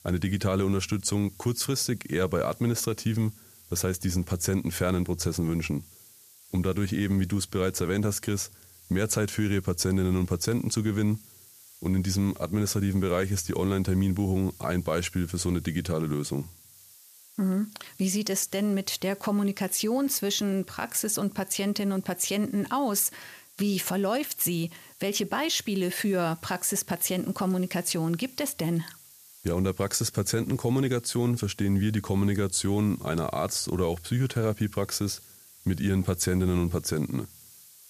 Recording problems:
hiss; faint; throughout; 20 dB below the speech

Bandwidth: 14.5 kHz